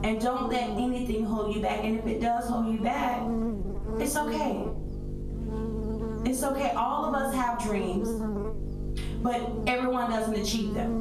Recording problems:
off-mic speech; far
room echo; slight; dies away in 0.4 s
squashed, flat; somewhat
electrical hum; noticeable; throughout; 50 Hz, 10 dB below the speech

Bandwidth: 13.5 kHz